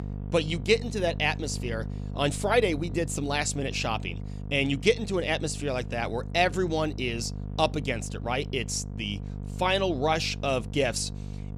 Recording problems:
electrical hum; noticeable; throughout; 50 Hz, 20 dB below the speech

